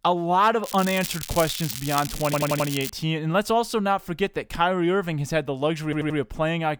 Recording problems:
crackling; loud; from 0.5 to 3 s; 8 dB below the speech
audio stuttering; at 2.5 s and at 6 s

